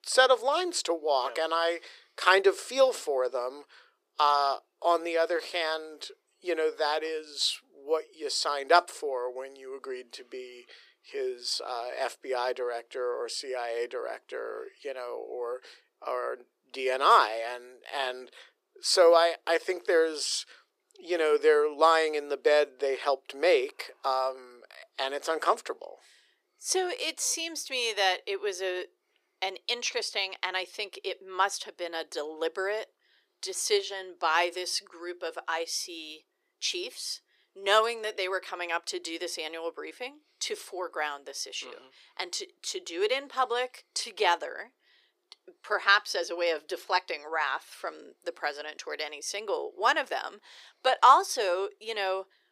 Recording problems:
thin; very; fading below 400 Hz

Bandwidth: 15 kHz